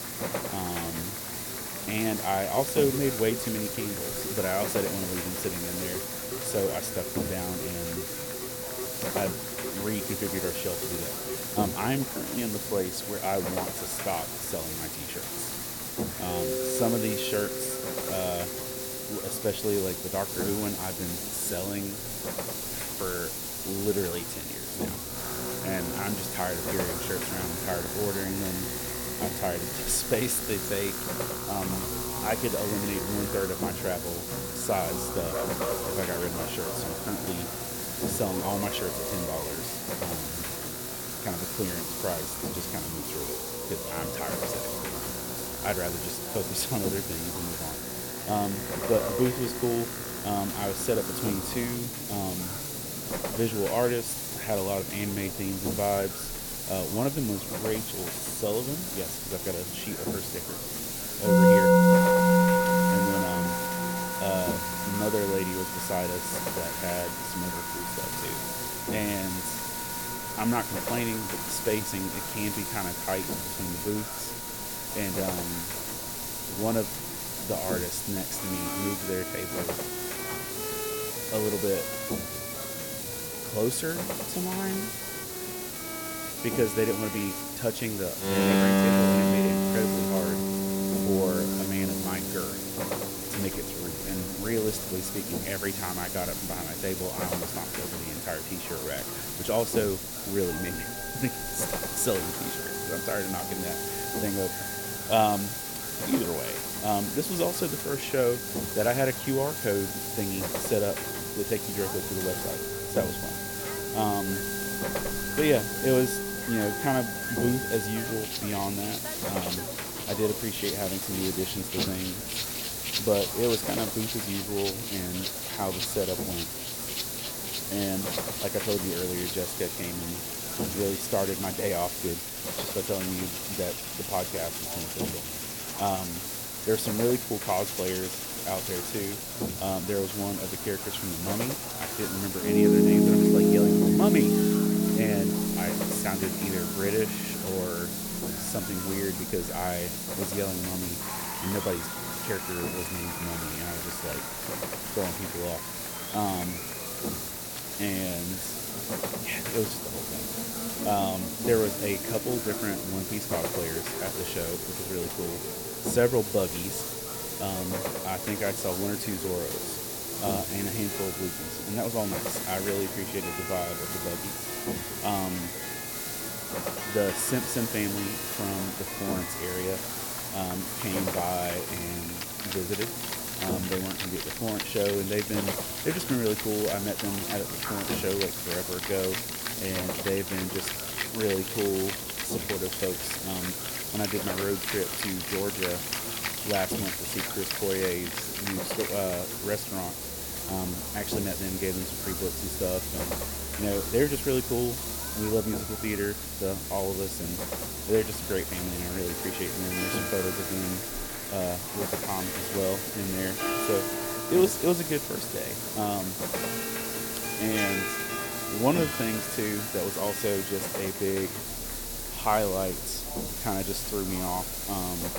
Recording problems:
electrical hum; loud; throughout; 60 Hz, 10 dB below the speech
background music; loud; throughout; 1 dB below the speech
hiss; loud; throughout; 1 dB below the speech
murmuring crowd; noticeable; throughout; 10 dB below the speech

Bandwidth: 17.5 kHz